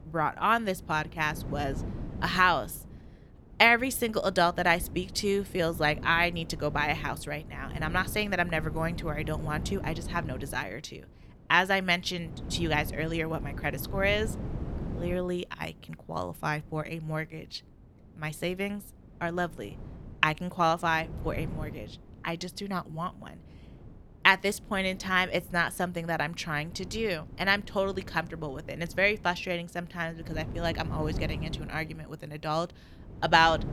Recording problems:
wind noise on the microphone; occasional gusts; 20 dB below the speech

